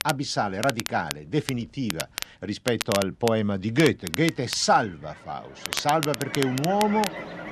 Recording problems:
crackle, like an old record; loud; 8 dB below the speech
animal sounds; noticeable; throughout; 15 dB below the speech
machinery noise; noticeable; throughout; 20 dB below the speech

